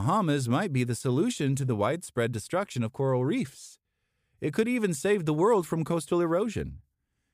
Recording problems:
abrupt cut into speech; at the start

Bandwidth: 15 kHz